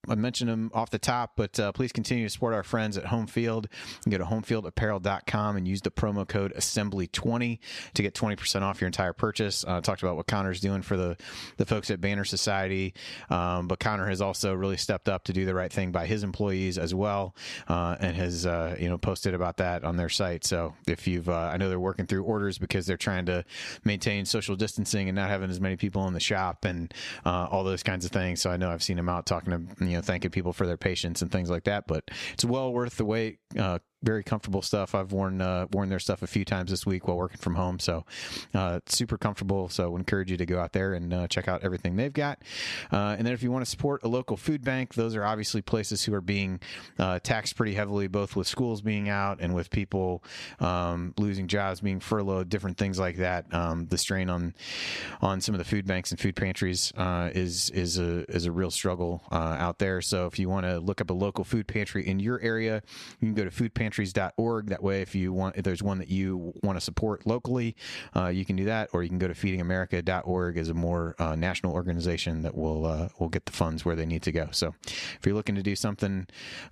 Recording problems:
squashed, flat; somewhat

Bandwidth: 14 kHz